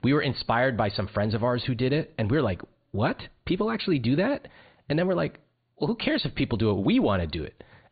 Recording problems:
high frequencies cut off; severe; nothing above 4.5 kHz

